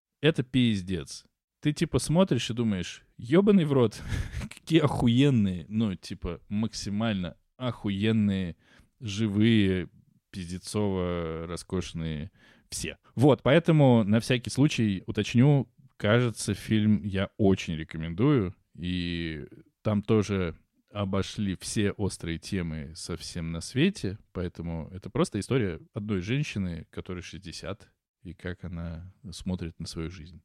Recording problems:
uneven, jittery; strongly; from 5.5 to 29 s

